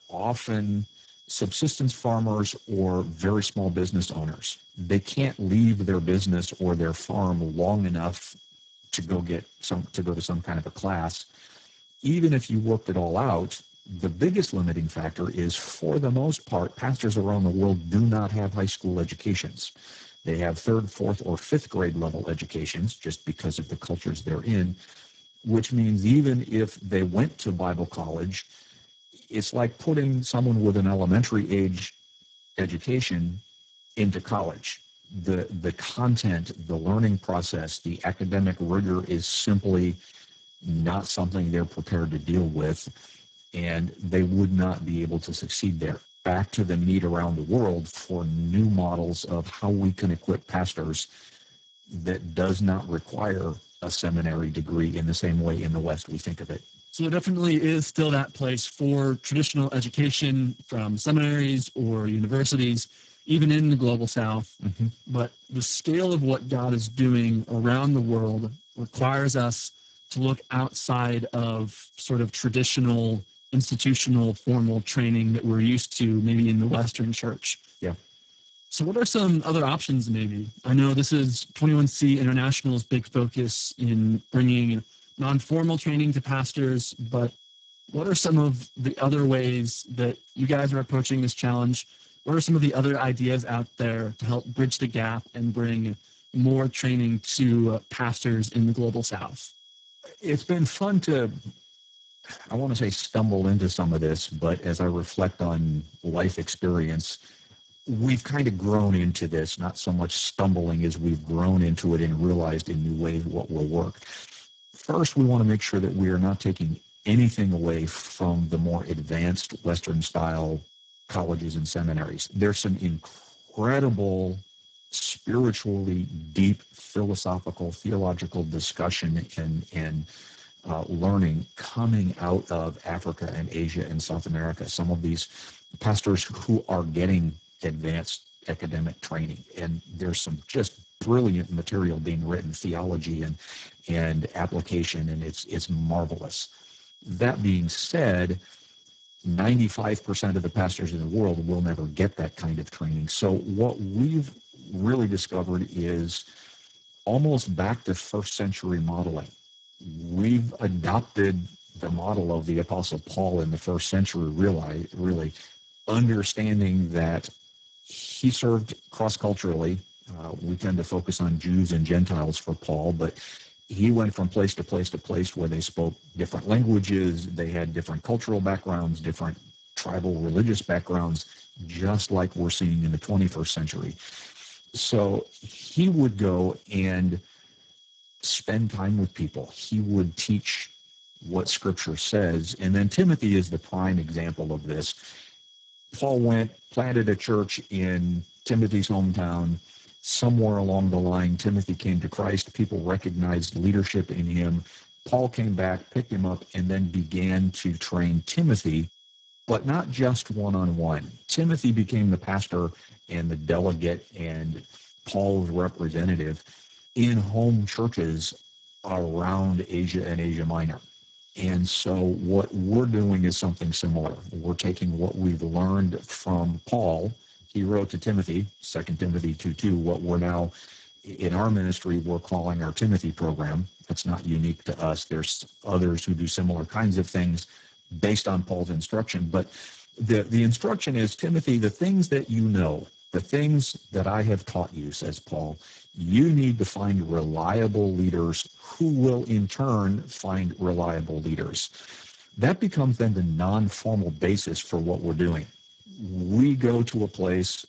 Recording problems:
garbled, watery; badly; nothing above 7.5 kHz
high-pitched whine; faint; throughout; 3.5 kHz, 25 dB below the speech

